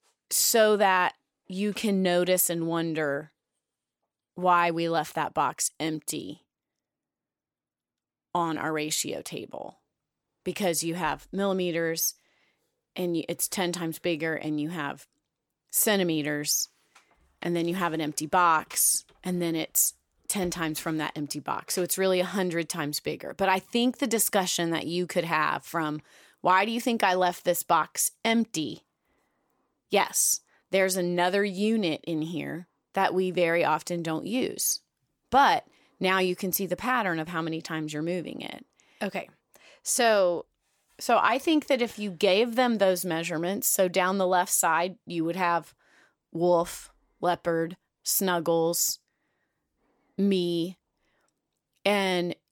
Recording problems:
none

